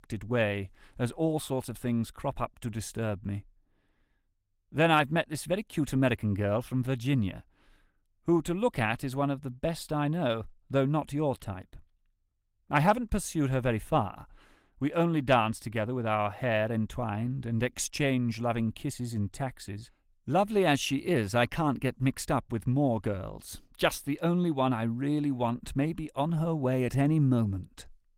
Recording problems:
garbled, watery; slightly; nothing above 16 kHz

